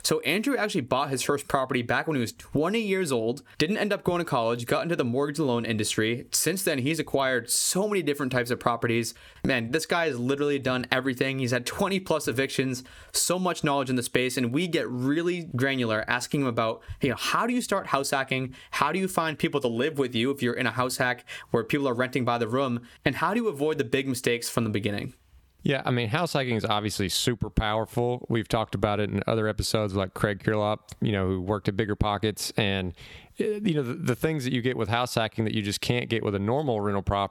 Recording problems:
squashed, flat; somewhat

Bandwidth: 18 kHz